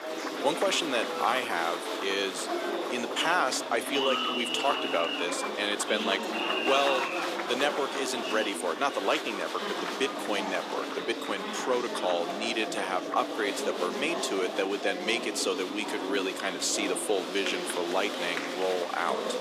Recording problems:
thin; somewhat; fading below 300 Hz
murmuring crowd; loud; throughout; 2 dB below the speech

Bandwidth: 15 kHz